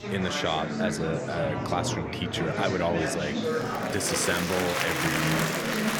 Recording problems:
murmuring crowd; very loud; throughout; 1 dB above the speech

